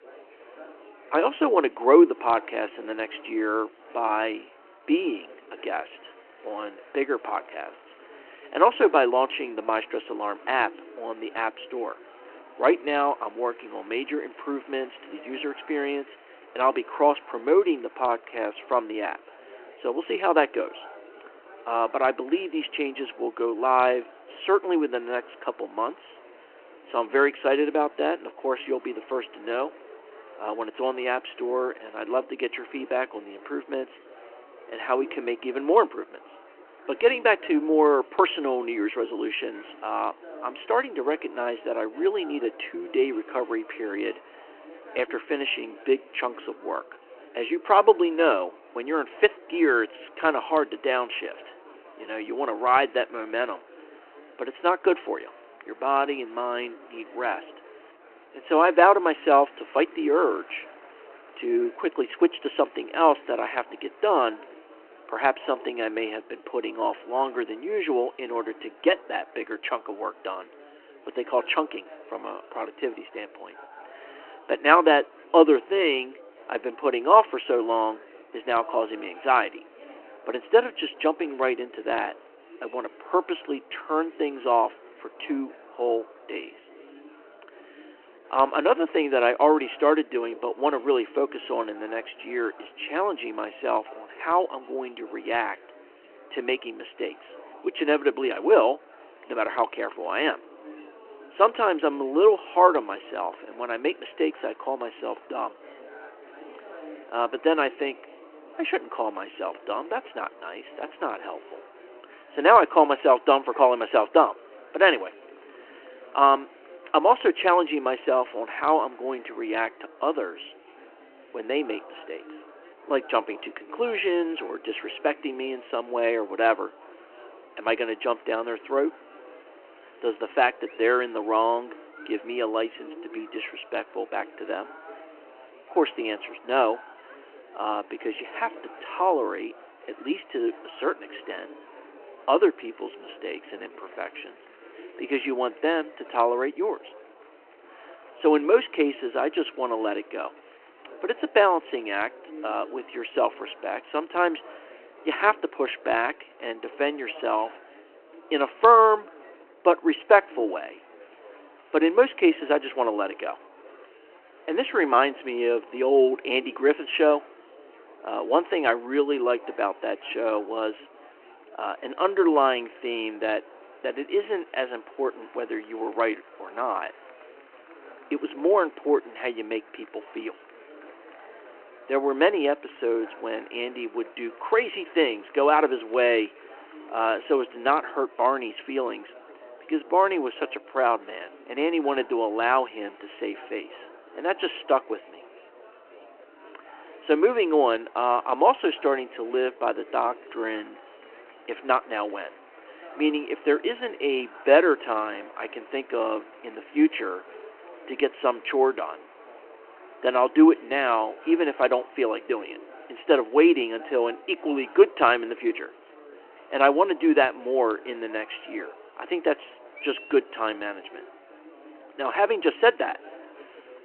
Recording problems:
phone-call audio
murmuring crowd; faint; throughout; 25 dB below the speech

